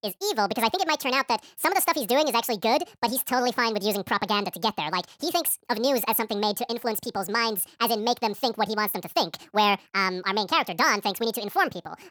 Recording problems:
wrong speed and pitch; too fast and too high; 1.7 times normal speed

